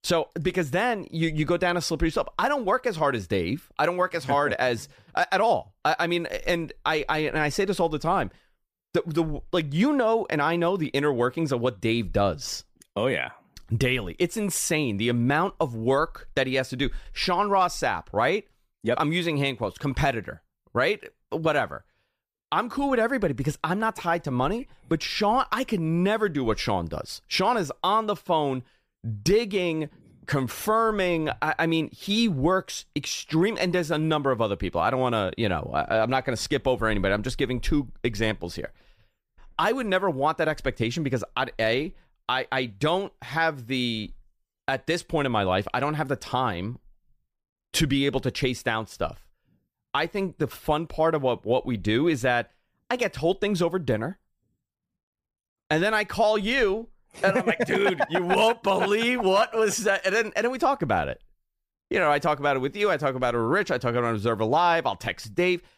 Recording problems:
none

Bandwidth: 15 kHz